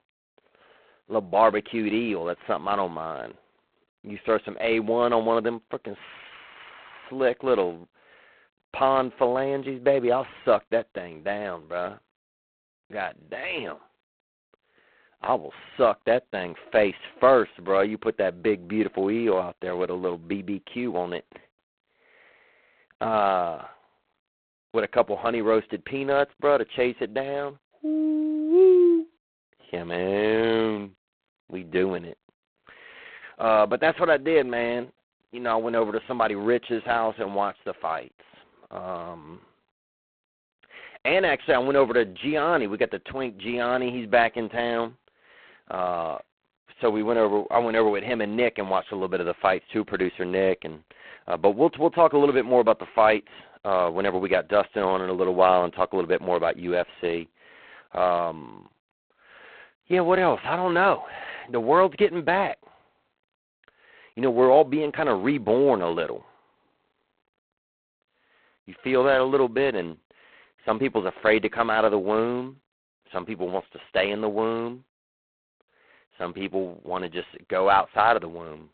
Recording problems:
phone-call audio; poor line; nothing above 4 kHz

